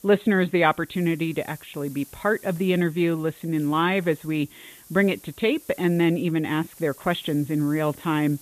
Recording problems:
high frequencies cut off; severe; nothing above 4 kHz
hiss; faint; throughout; 20 dB below the speech

